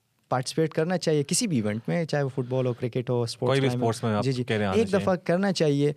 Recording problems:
none

